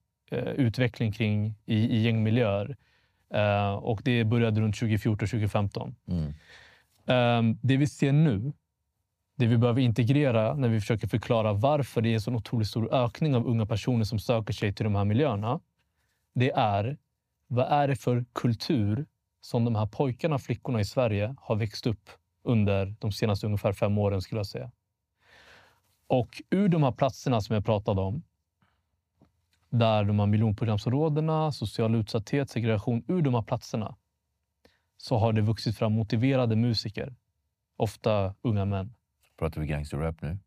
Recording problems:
none

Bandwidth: 15 kHz